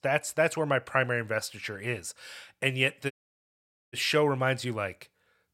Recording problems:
audio cutting out; at 3 s for 1 s

